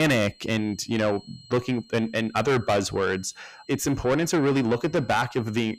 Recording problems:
distortion; heavy; 6 dB below the speech
high-pitched whine; faint; throughout; 4 kHz, 25 dB below the speech
abrupt cut into speech; at the start

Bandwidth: 15 kHz